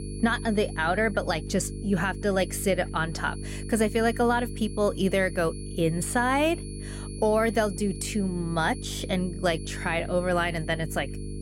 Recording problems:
electrical hum; noticeable; throughout; 50 Hz, 20 dB below the speech
high-pitched whine; noticeable; throughout; 10.5 kHz, 20 dB below the speech

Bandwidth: 16 kHz